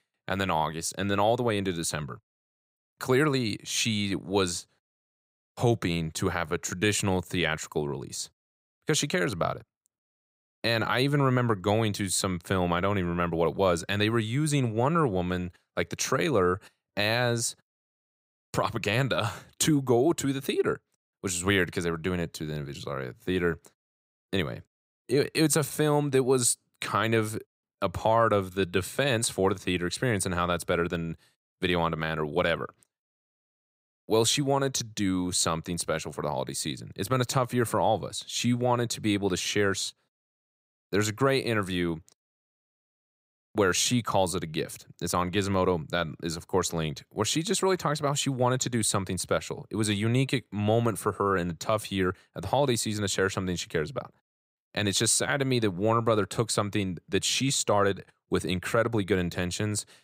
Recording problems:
none

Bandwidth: 15.5 kHz